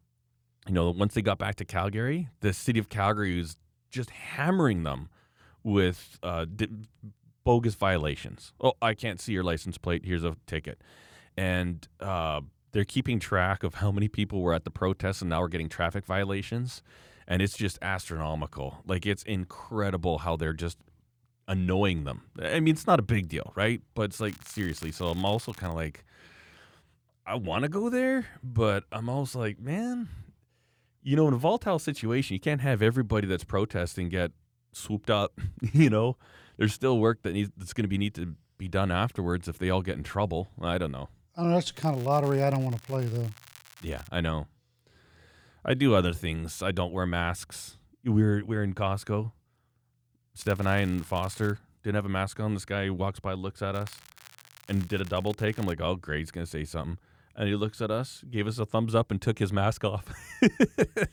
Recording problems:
crackling; faint; 4 times, first at 24 s; 20 dB below the speech

